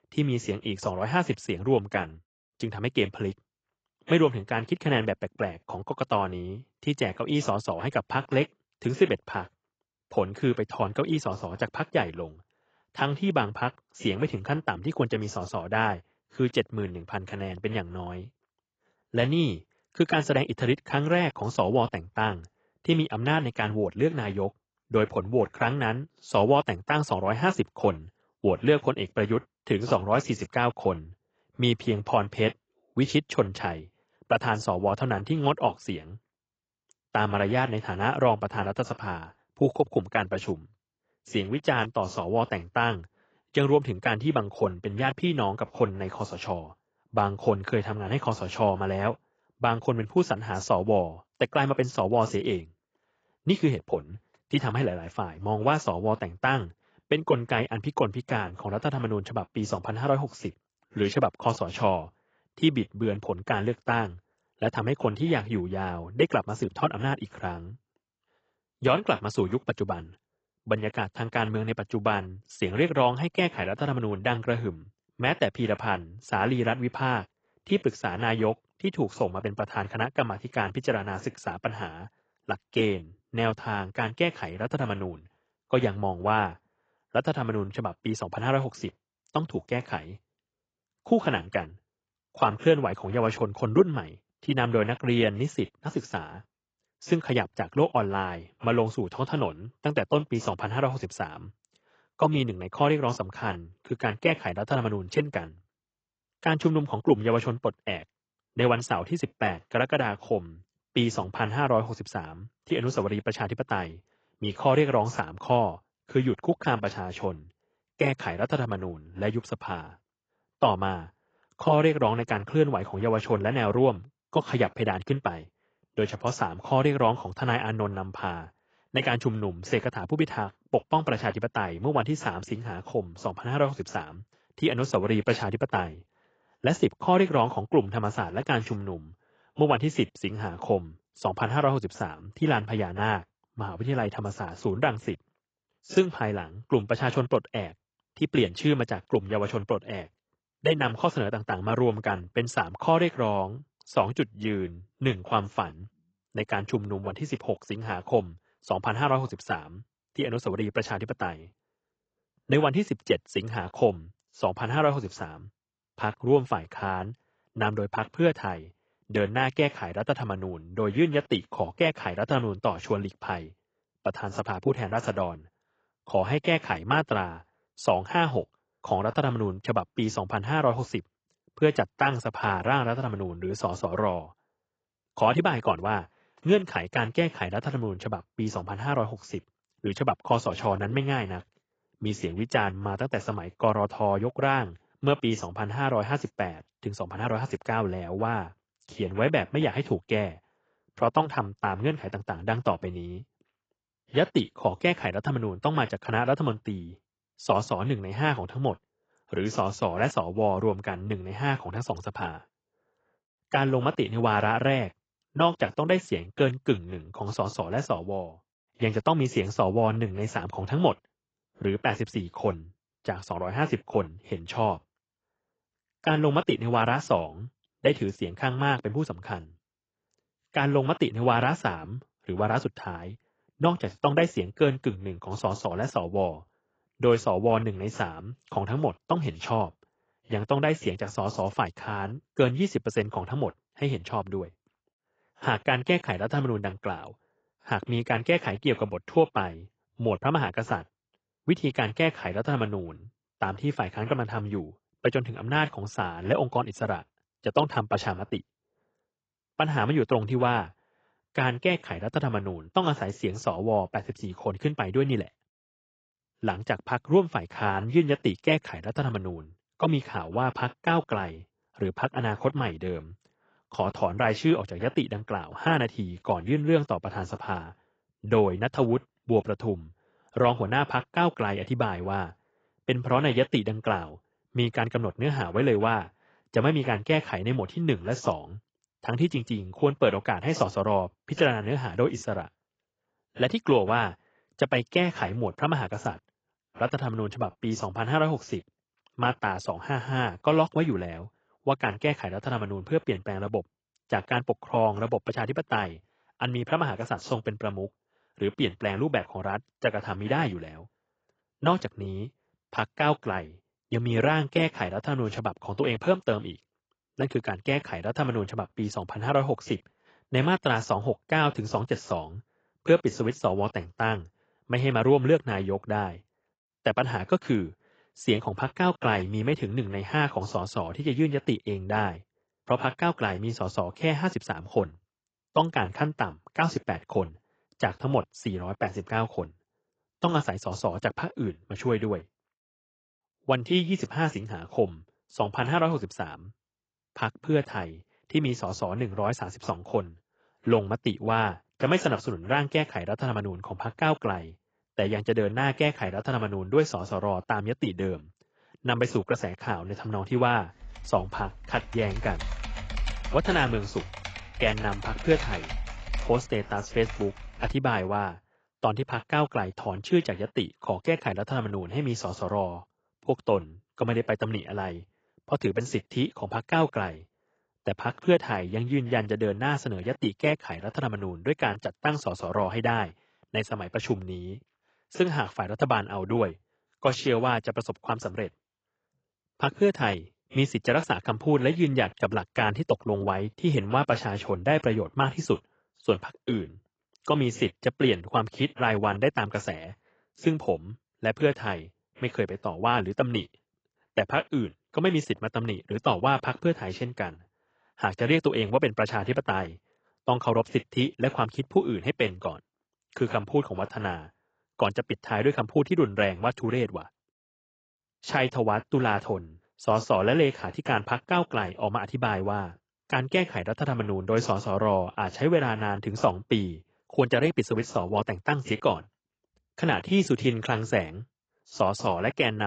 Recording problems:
garbled, watery; badly; nothing above 7.5 kHz
keyboard typing; noticeable; from 6:01 to 6:08; peak 6 dB below the speech
abrupt cut into speech; at the end

